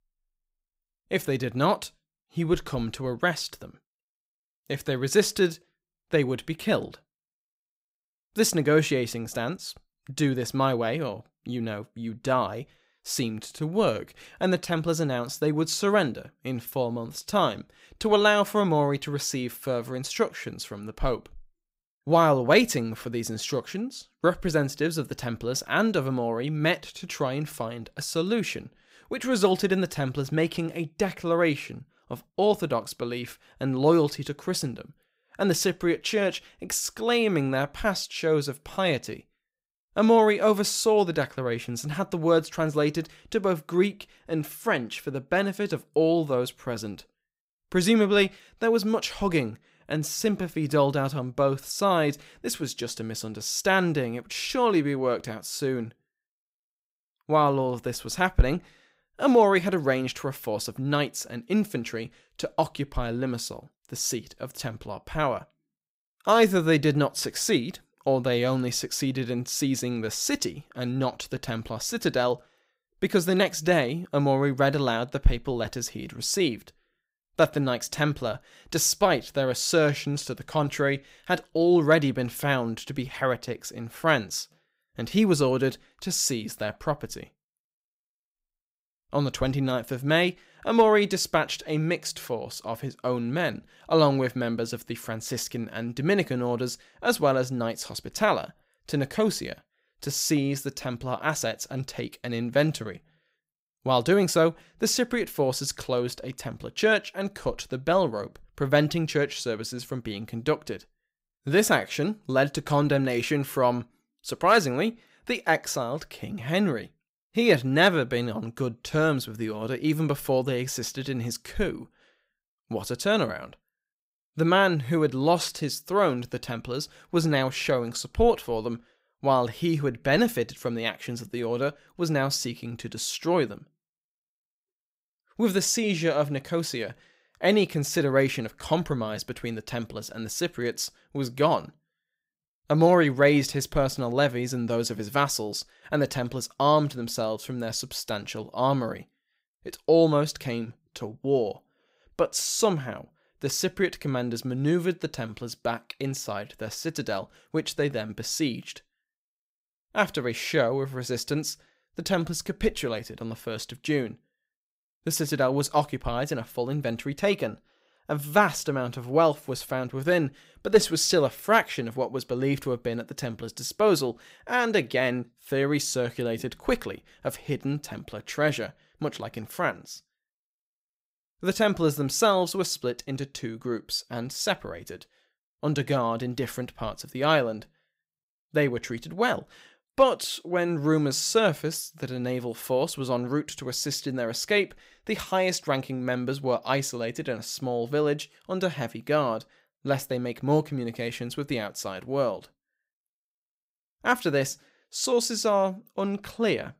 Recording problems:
none

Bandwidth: 15.5 kHz